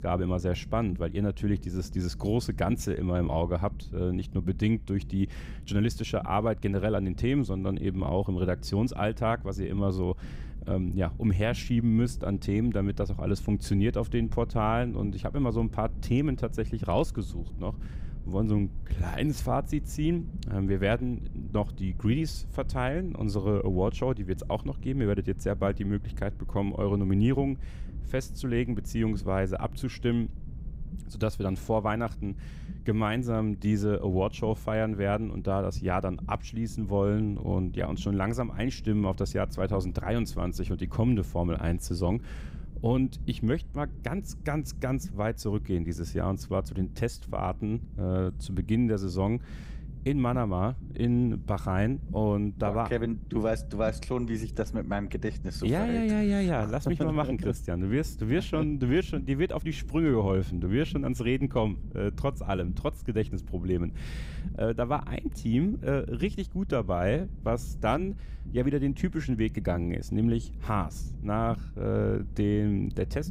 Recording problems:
low rumble; faint; throughout; 20 dB below the speech

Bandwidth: 15.5 kHz